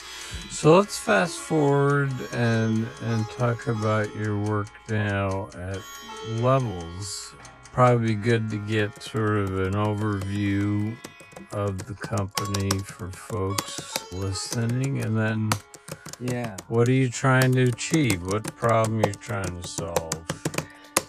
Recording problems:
wrong speed, natural pitch; too slow; 0.6 times normal speed
household noises; loud; throughout; 9 dB below the speech
background music; noticeable; throughout; 20 dB below the speech

